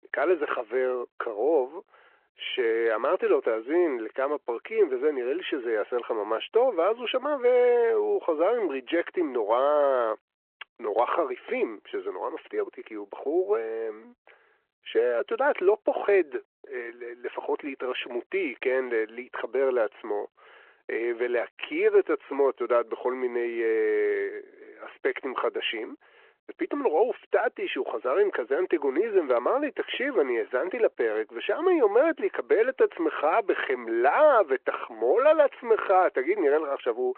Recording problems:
phone-call audio

